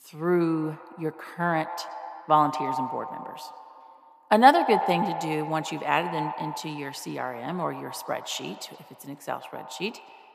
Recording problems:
echo of what is said; strong; throughout; 120 ms later, 8 dB below the speech

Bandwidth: 14.5 kHz